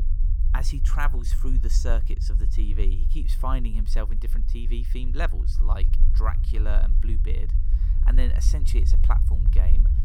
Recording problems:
low rumble; noticeable; throughout; 10 dB below the speech

